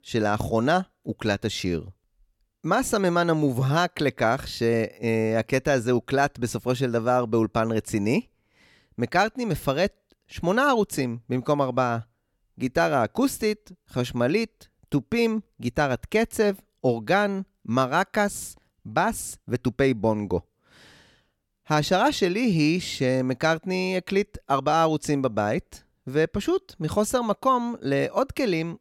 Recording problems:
none

